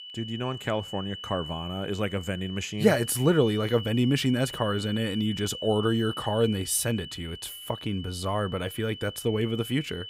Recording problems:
high-pitched whine; noticeable; throughout; 3 kHz, 10 dB below the speech

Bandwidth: 15.5 kHz